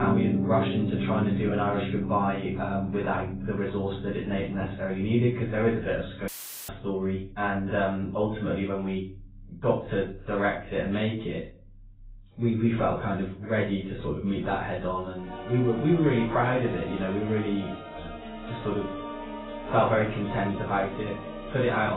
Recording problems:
off-mic speech; far
garbled, watery; badly; nothing above 4 kHz
room echo; slight; dies away in 0.3 s
background music; loud; throughout; 6 dB below the speech
abrupt cut into speech; at the start and the end
audio cutting out; filled with static; at 6.5 s

